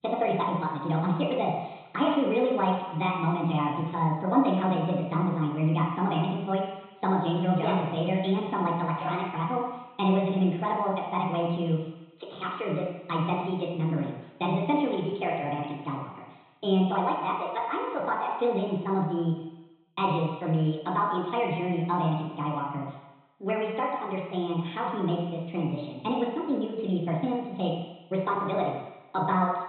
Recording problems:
off-mic speech; far
high frequencies cut off; severe; nothing above 3.5 kHz
wrong speed and pitch; too fast and too high; 1.5 times normal speed
room echo; noticeable; dies away in 1 s

